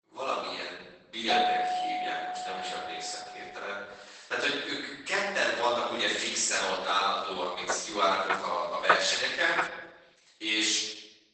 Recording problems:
off-mic speech; far
garbled, watery; badly; nothing above 8 kHz
thin; very; fading below 700 Hz
room echo; noticeable; dies away in 1 s
doorbell; loud; from 1.5 to 3.5 s; peak 3 dB above the speech
footsteps; loud; from 7.5 to 9.5 s; peak 3 dB above the speech

